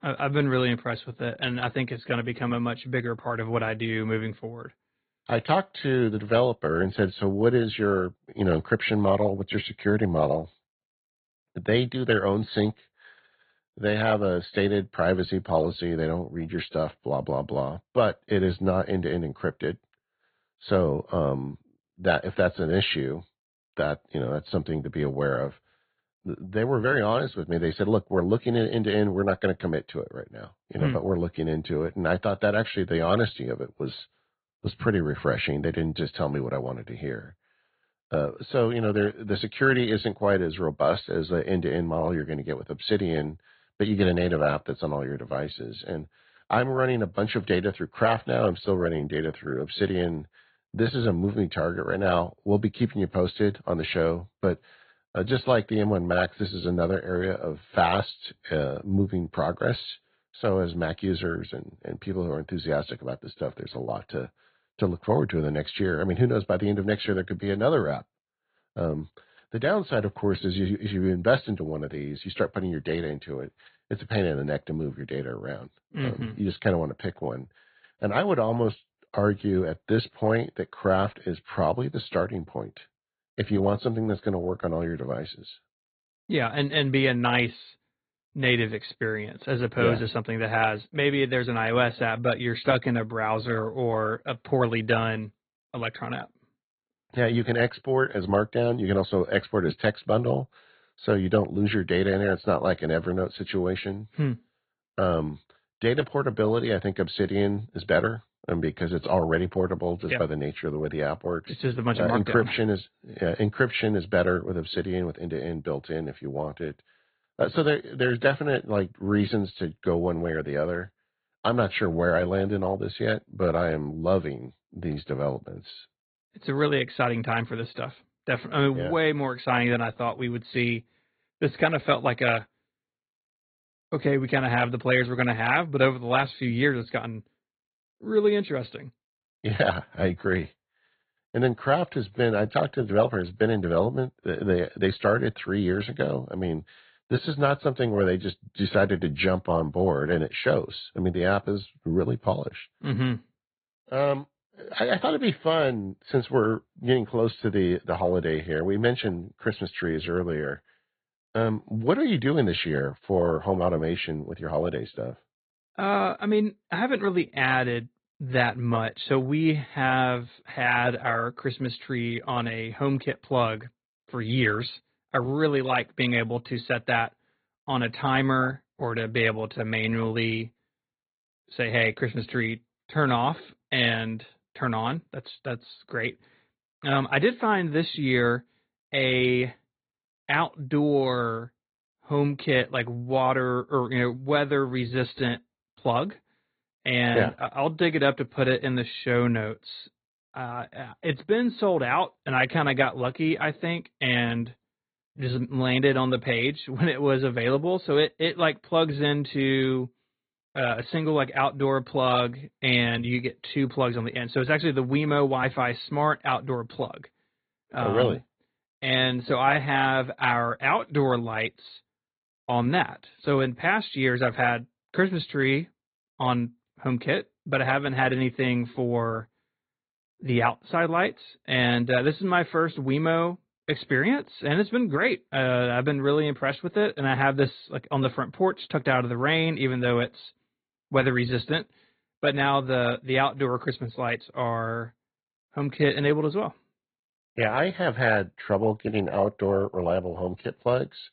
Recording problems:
high frequencies cut off; severe; nothing above 4 kHz
garbled, watery; slightly

